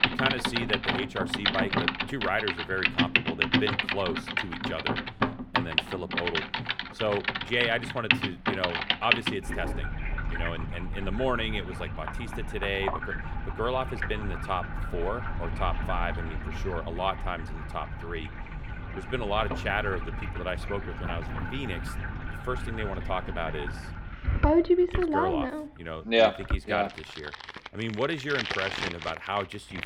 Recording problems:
household noises; very loud; throughout; 2 dB above the speech

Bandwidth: 17 kHz